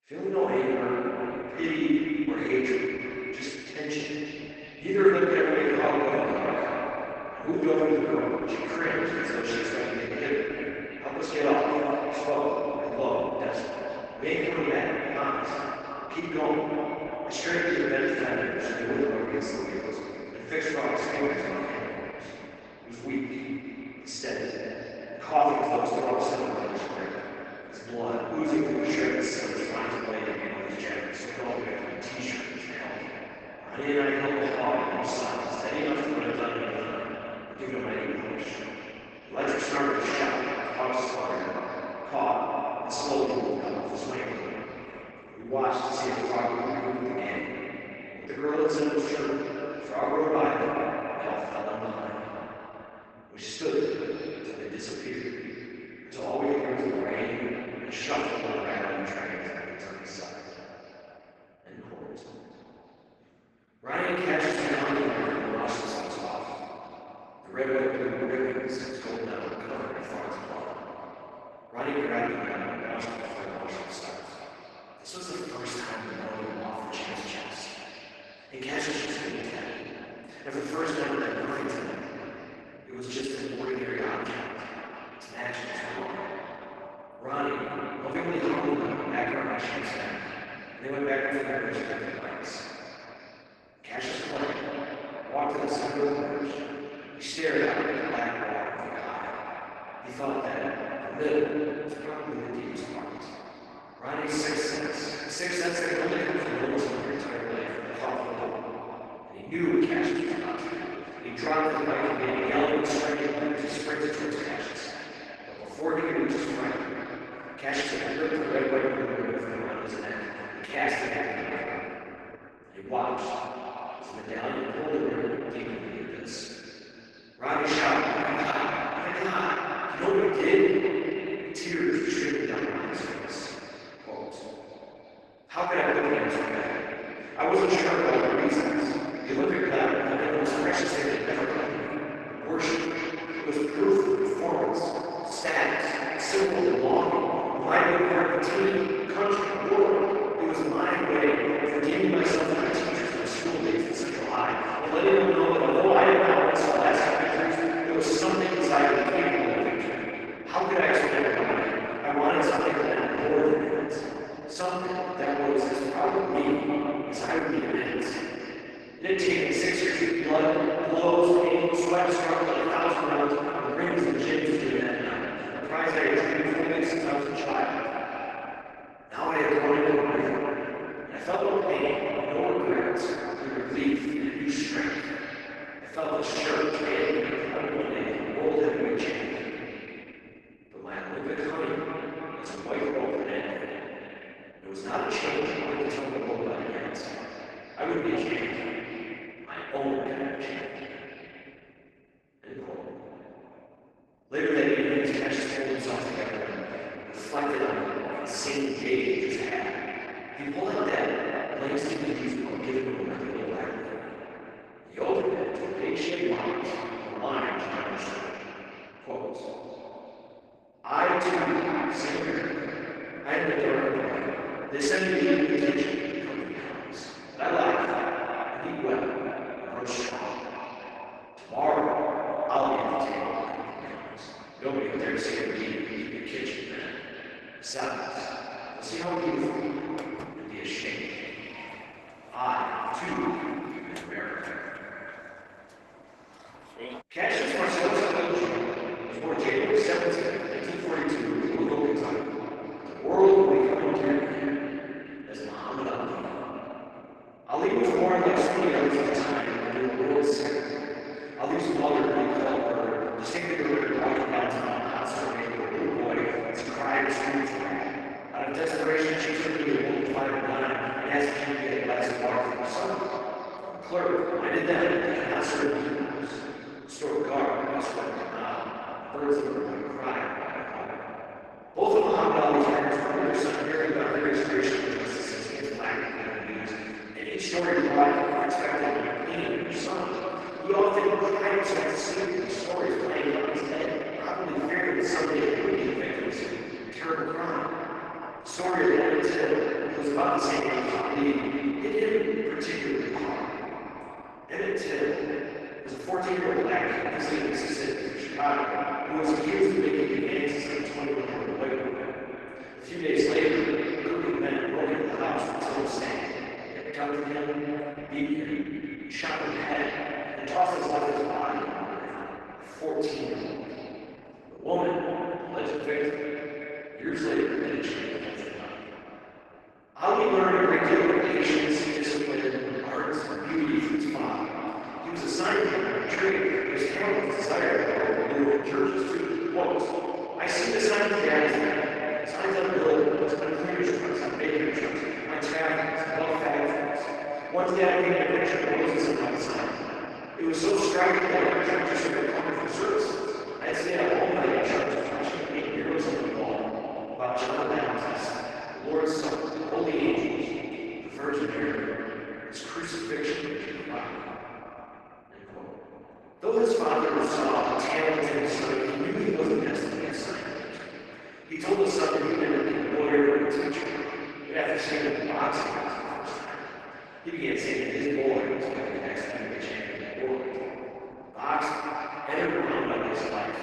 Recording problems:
echo of what is said; strong; throughout; 330 ms later, 8 dB below the speech
room echo; strong; dies away in 2.9 s
off-mic speech; far
garbled, watery; badly
thin; very slightly; fading below 350 Hz
footsteps; faint; from 4:00 to 4:07; peak 10 dB below the speech

